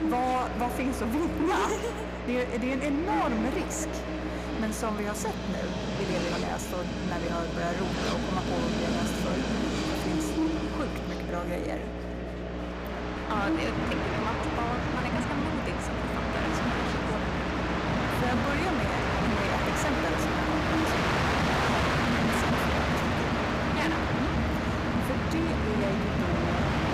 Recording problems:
echo of what is said; strong; throughout; 140 ms later, 10 dB below the speech
distortion; slight; 13% of the sound clipped
train or aircraft noise; very loud; throughout; 3 dB above the speech
electrical hum; loud; throughout; 60 Hz, 6 dB below the speech
chatter from many people; noticeable; throughout; 10 dB below the speech

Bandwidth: 15 kHz